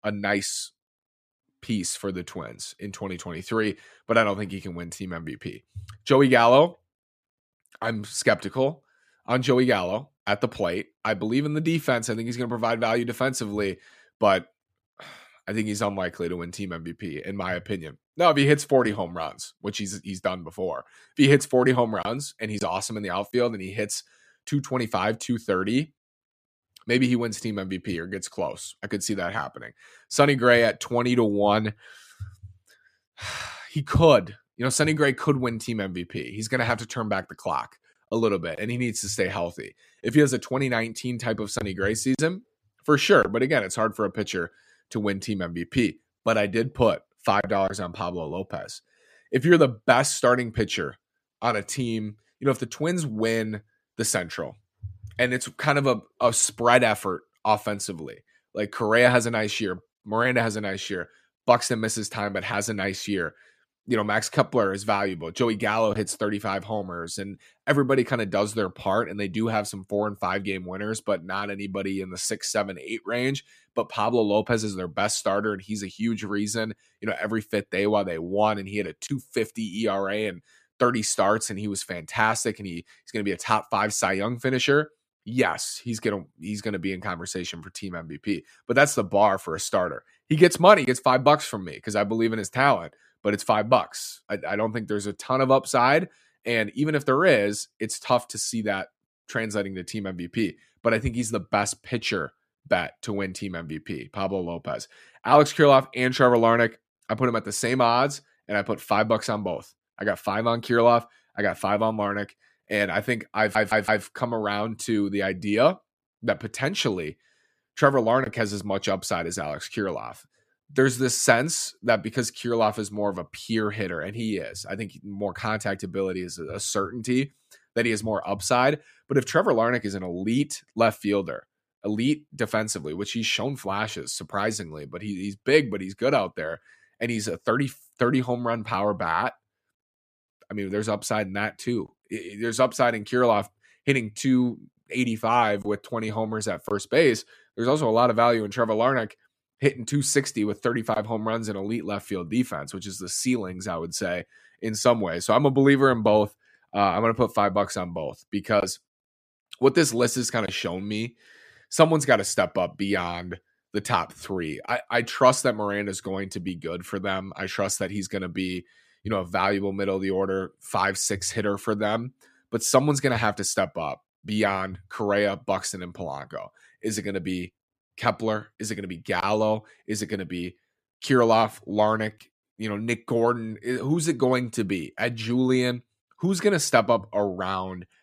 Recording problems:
audio stuttering; at 1:53

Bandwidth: 14.5 kHz